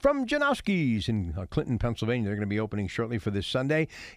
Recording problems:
none

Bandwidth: 15 kHz